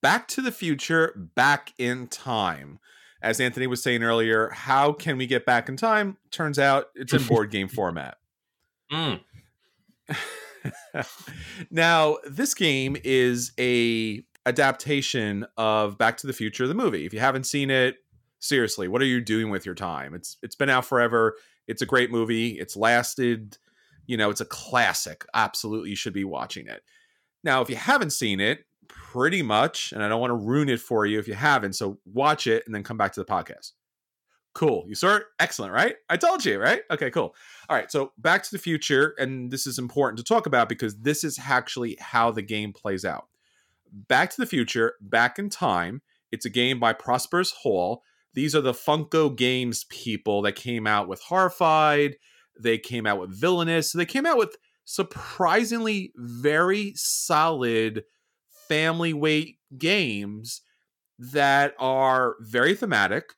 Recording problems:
none

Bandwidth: 17 kHz